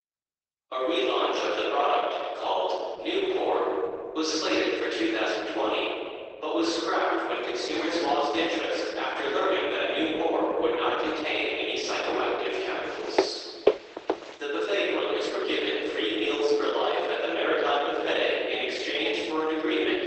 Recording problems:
room echo; strong; dies away in 2.1 s
off-mic speech; far
garbled, watery; badly; nothing above 8 kHz
thin; very; fading below 300 Hz
footsteps; loud; at 13 s; peak level with the speech

